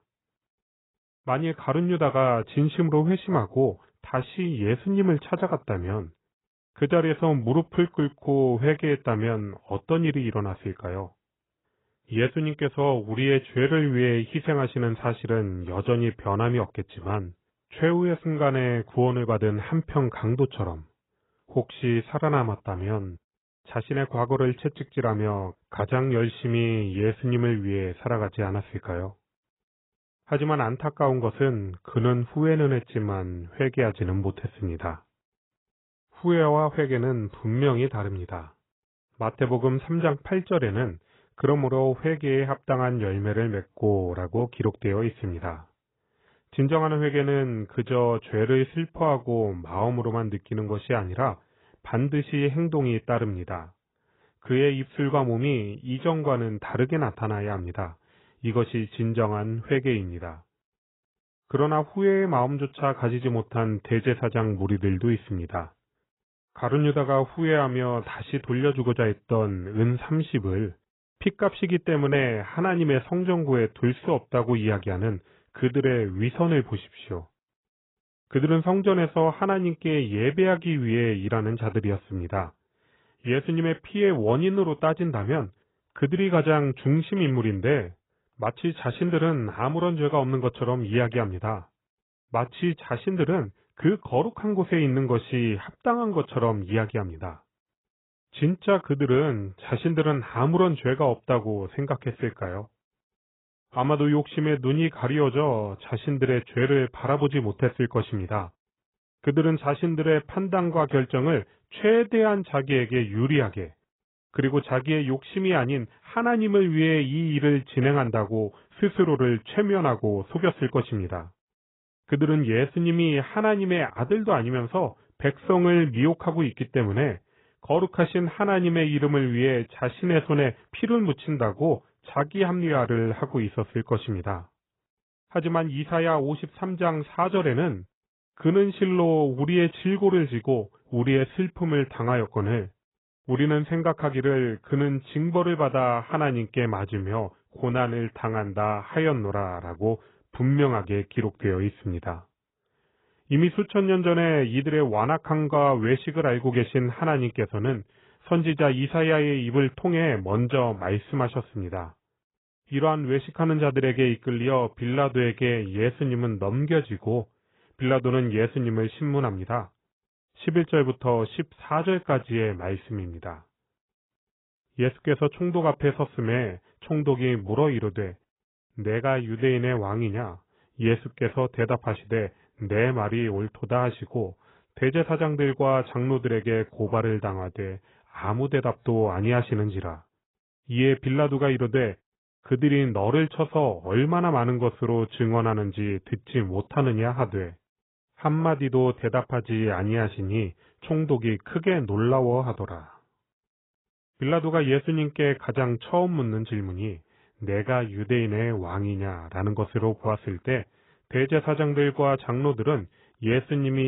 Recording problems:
garbled, watery; badly; nothing above 3.5 kHz
abrupt cut into speech; at the end

